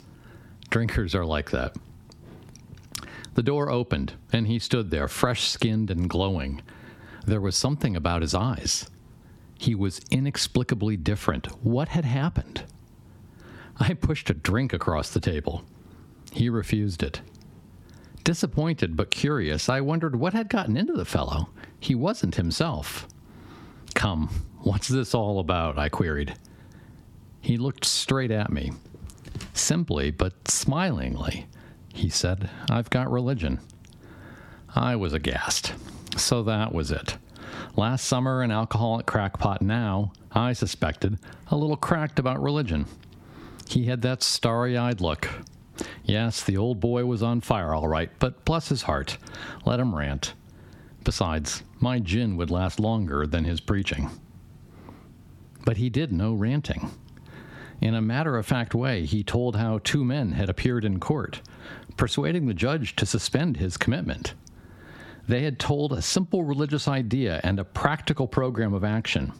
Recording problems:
squashed, flat; heavily

